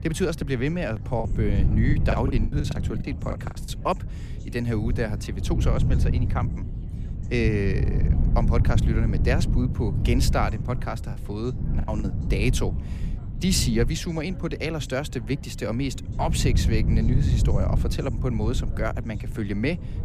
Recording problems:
wind noise on the microphone; heavy; 9 dB below the speech
background chatter; faint; throughout; 4 voices, 25 dB below the speech
choppy; very; from 1 to 3.5 s and at 11 s; 21% of the speech affected

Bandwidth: 15 kHz